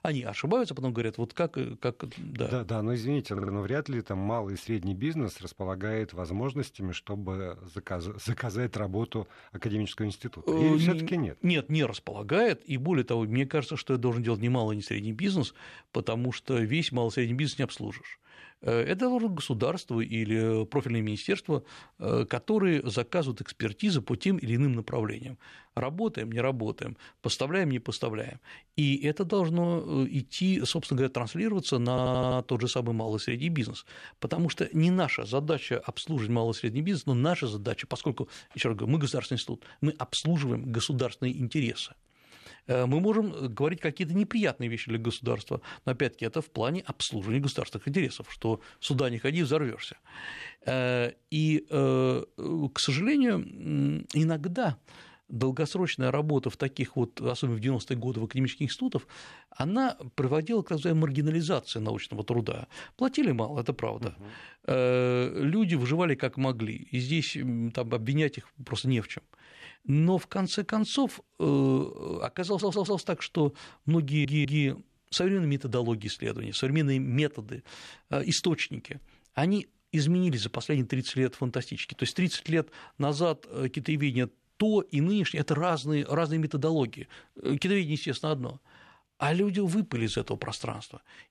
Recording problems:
audio stuttering; 4 times, first at 3.5 s

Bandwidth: 13.5 kHz